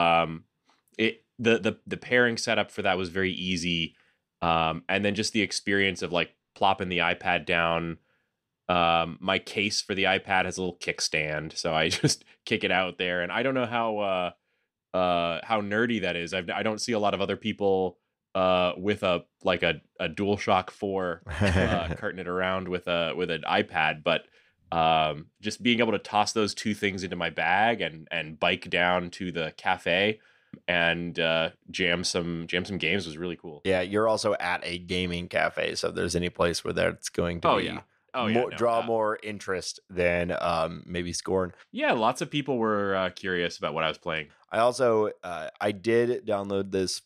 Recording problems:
abrupt cut into speech; at the start

